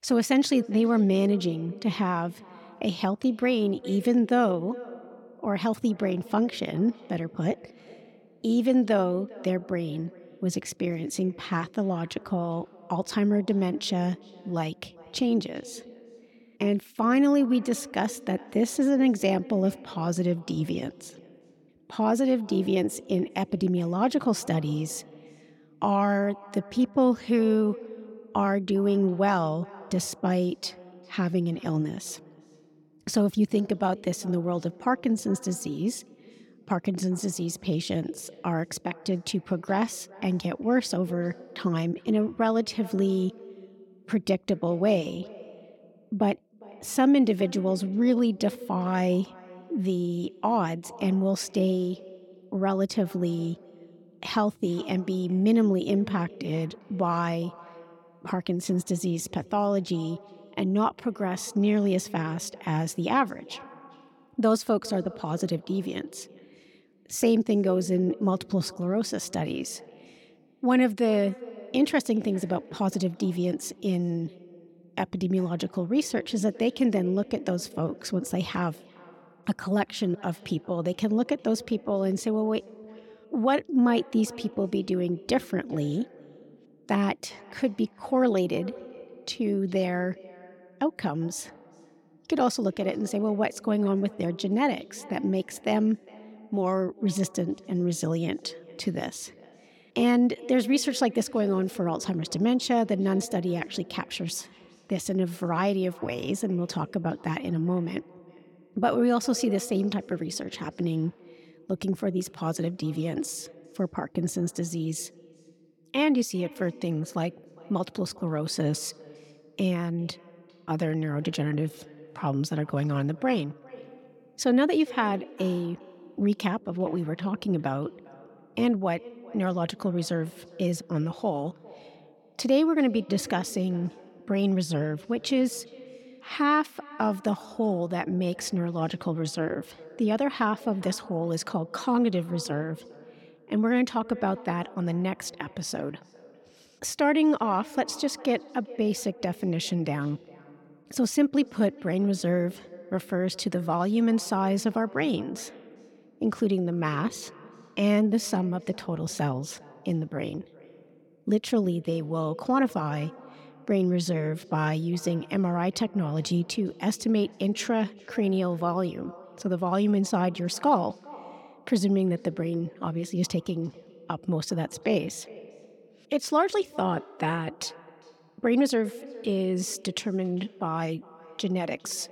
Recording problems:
echo of what is said; faint; throughout; 400 ms later, 20 dB below the speech

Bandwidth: 17.5 kHz